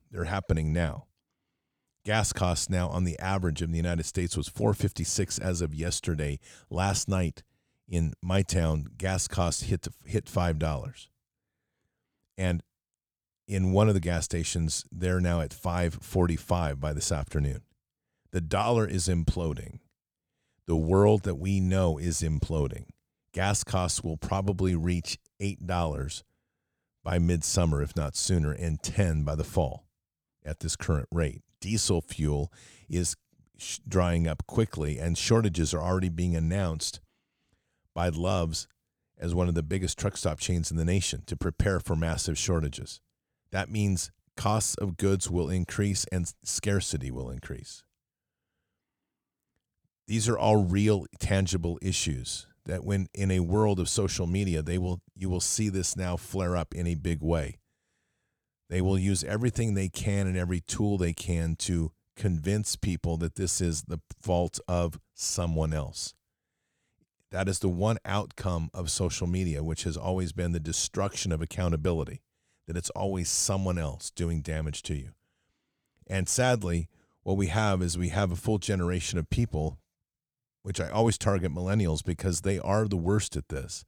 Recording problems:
none

